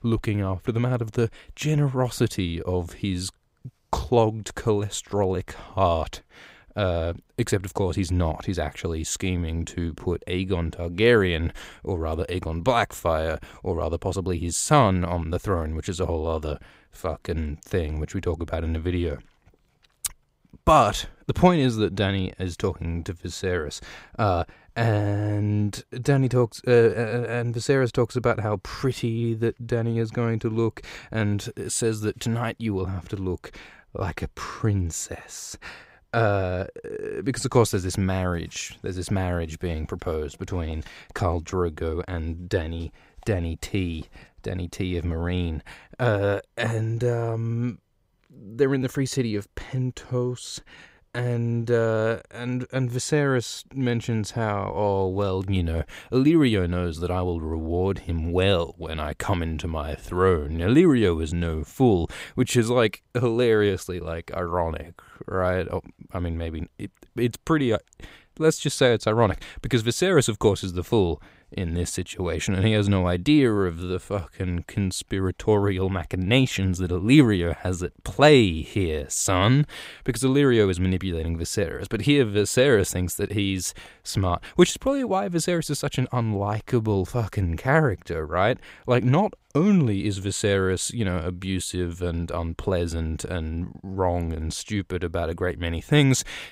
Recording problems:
none

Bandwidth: 15.5 kHz